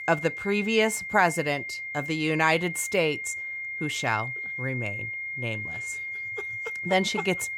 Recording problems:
high-pitched whine; loud; throughout; 2 kHz, 5 dB below the speech

